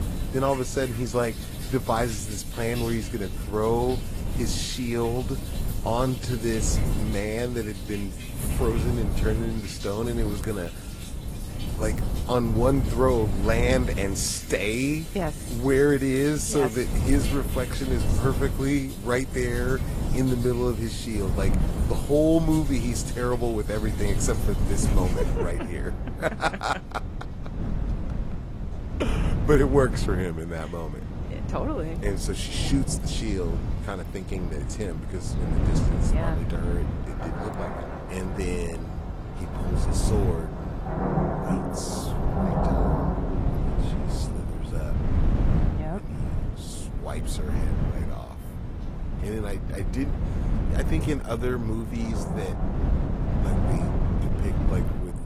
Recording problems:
garbled, watery; slightly
rain or running water; loud; throughout; 9 dB below the speech
wind noise on the microphone; occasional gusts; 10 dB below the speech

